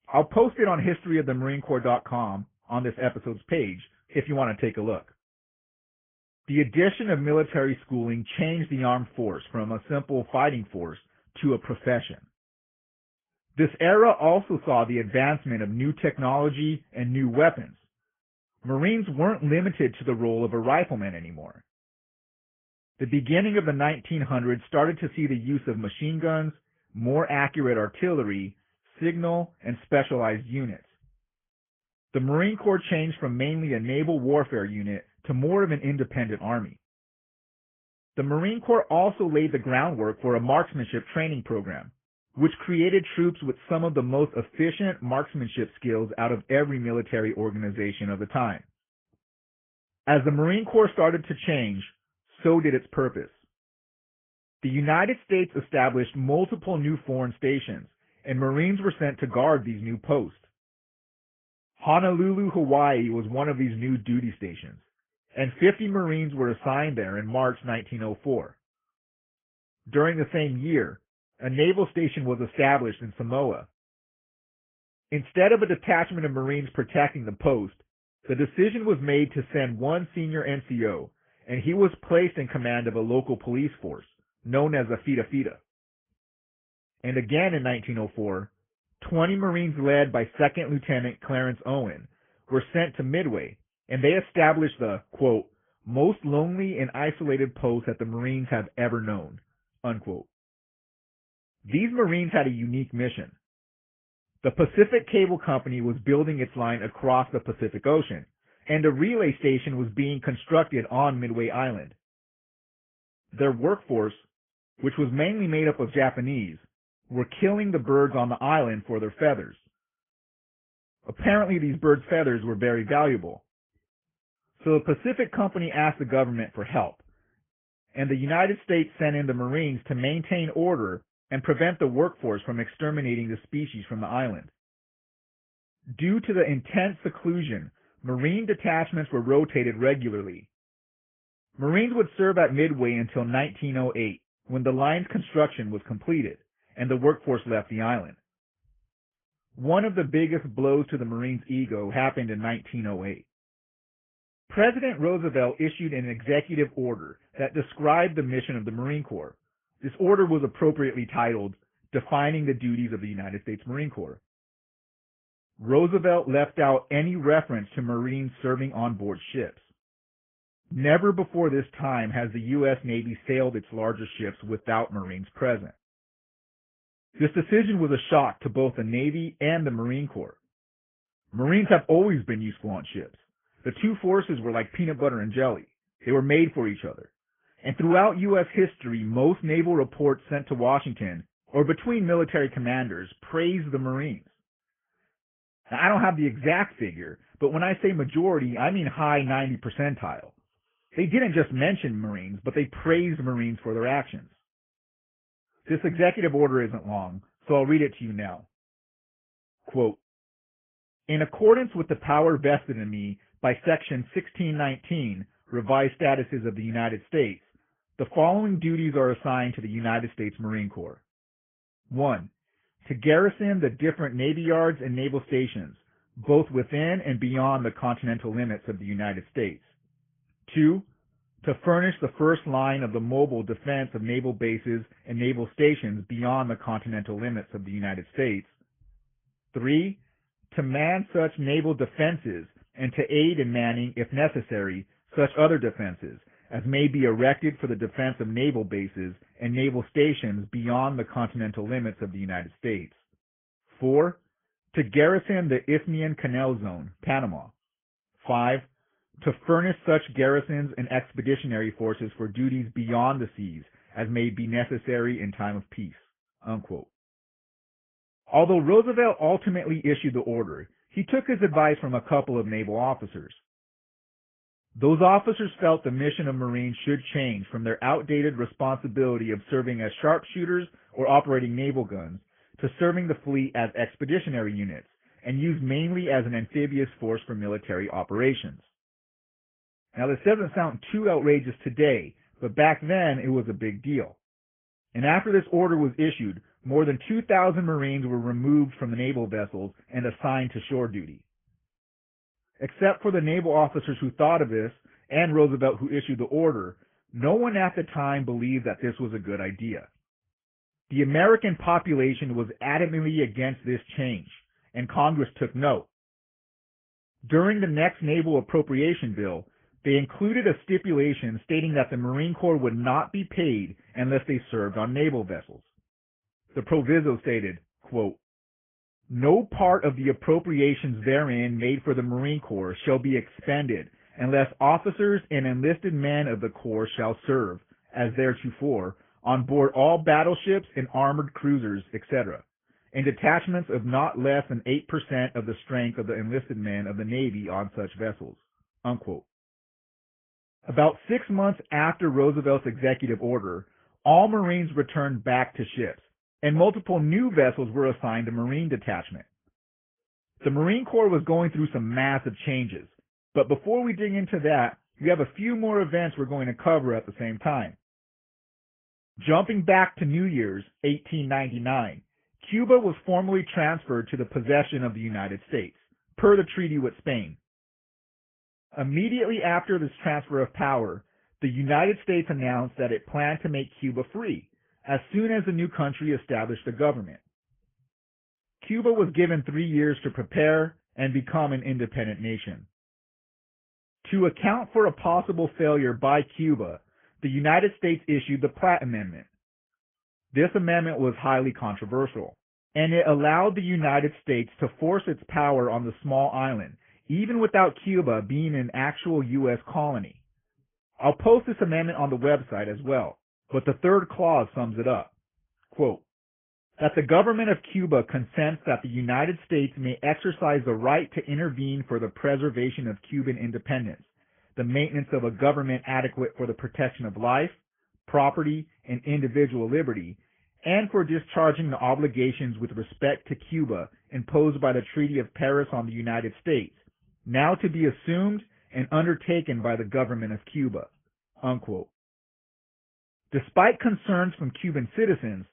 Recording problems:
high frequencies cut off; severe; nothing above 3.5 kHz
garbled, watery; slightly

